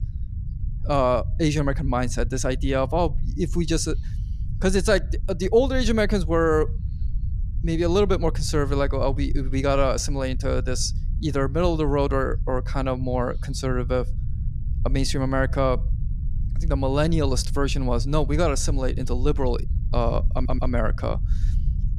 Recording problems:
low rumble; faint; throughout; 20 dB below the speech
audio stuttering; at 20 s

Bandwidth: 14.5 kHz